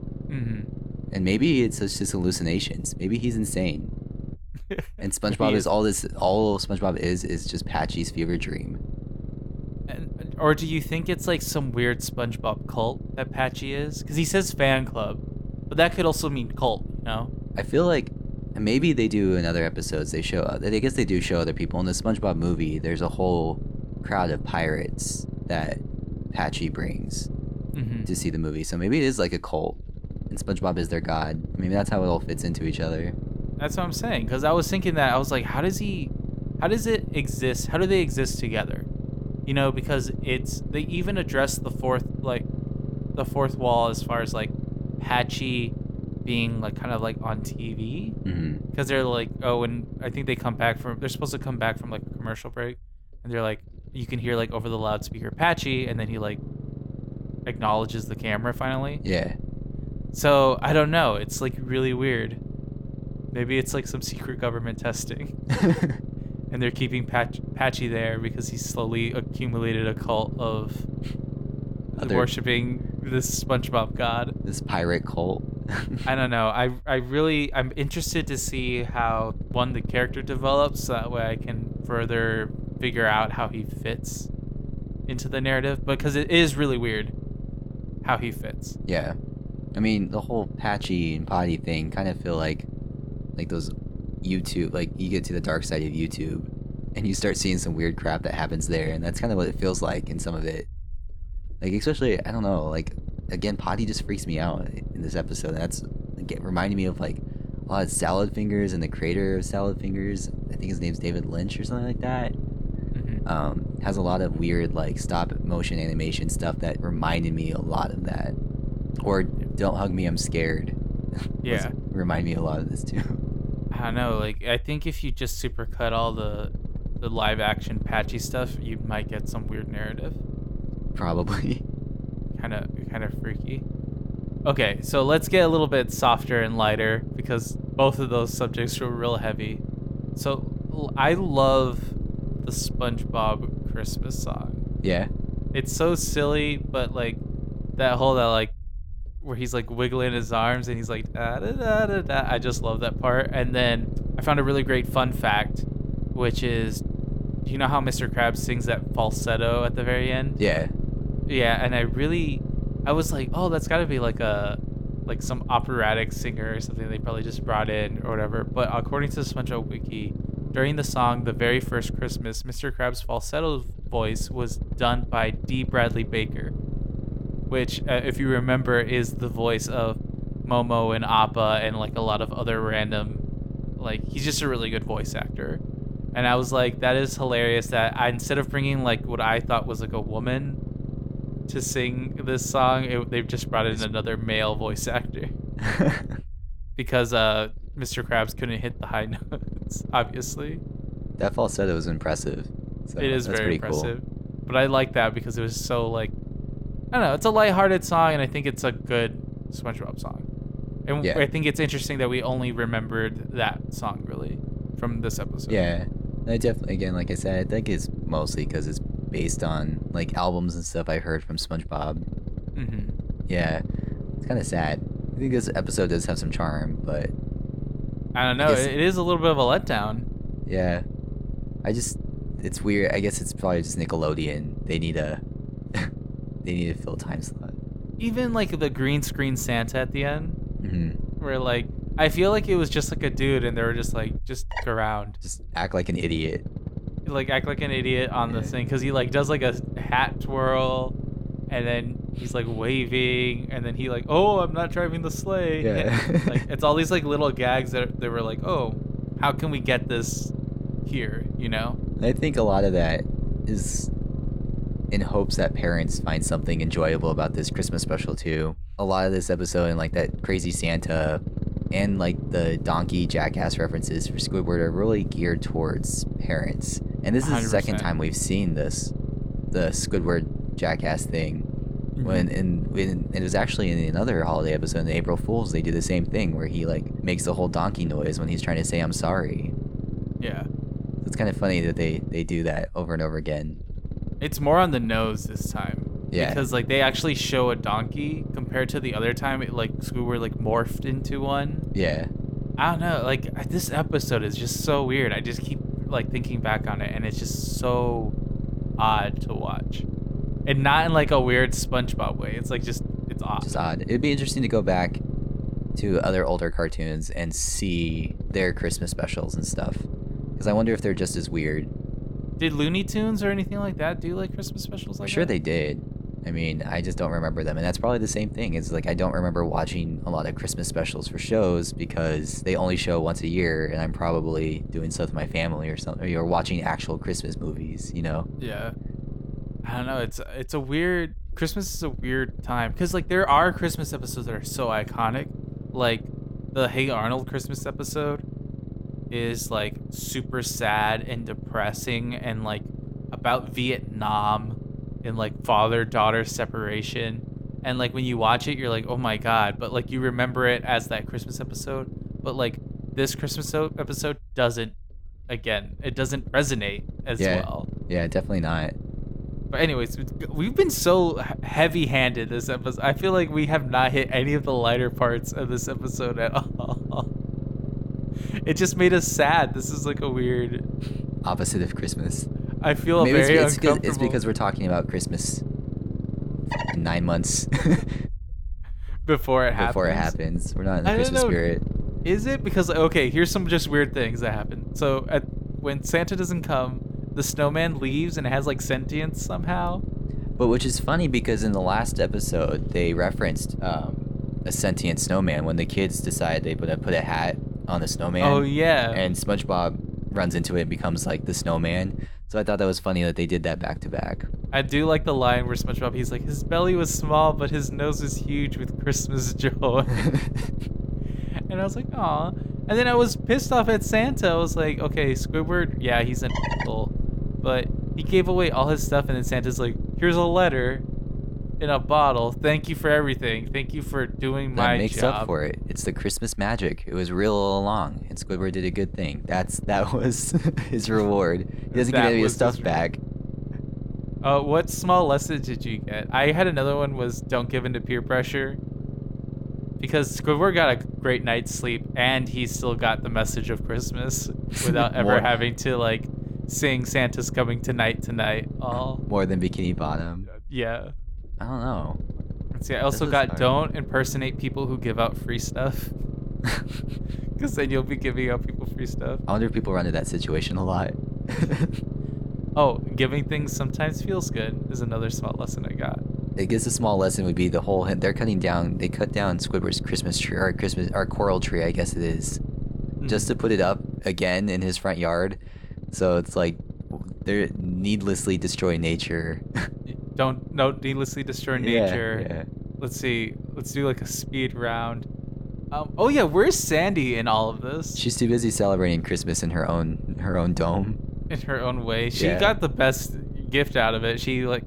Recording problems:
low rumble; noticeable; throughout; 15 dB below the speech

